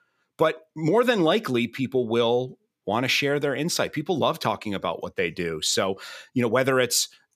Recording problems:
none

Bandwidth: 14.5 kHz